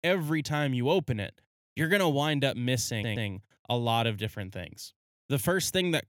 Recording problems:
audio stuttering; at 3 s

